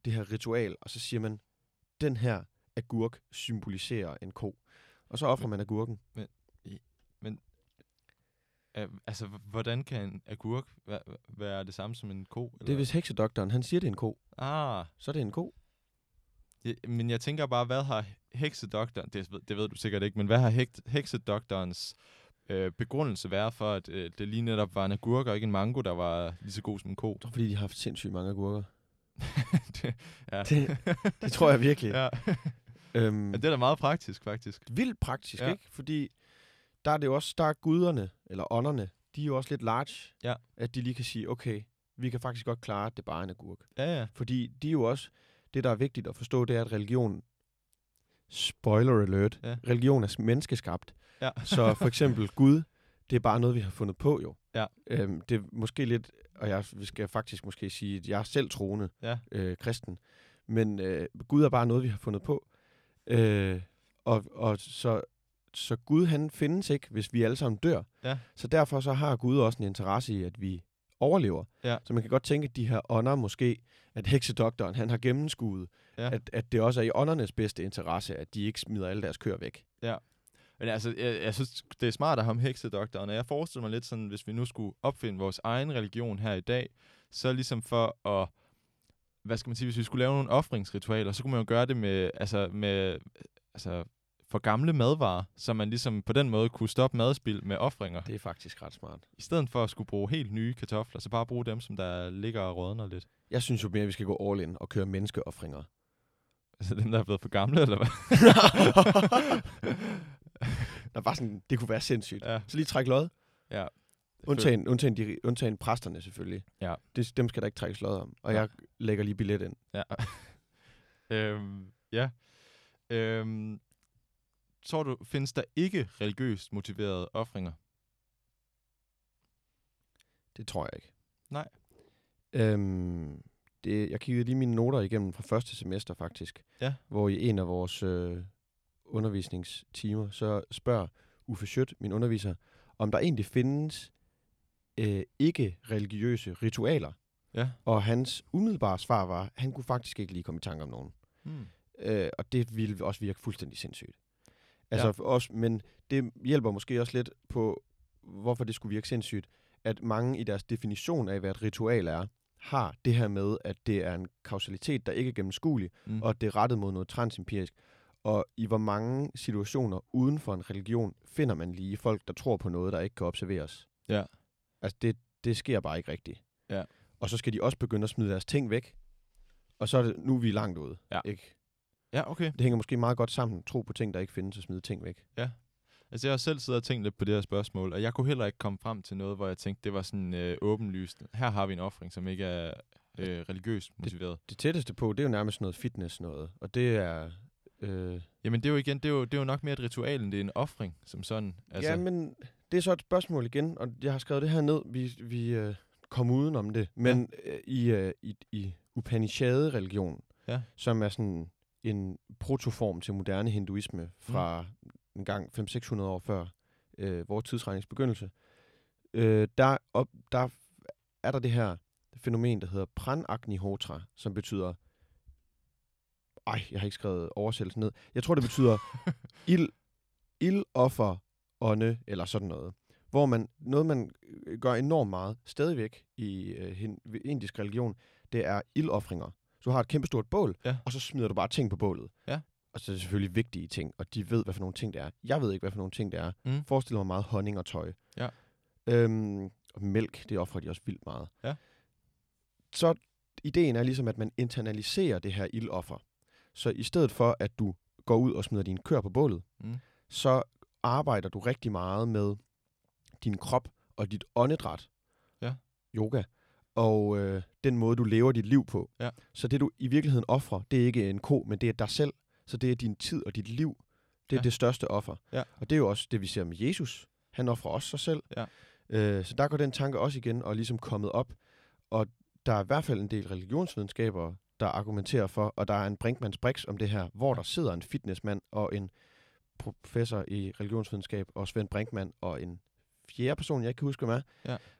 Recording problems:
none

